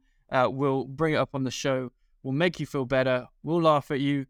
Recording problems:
none

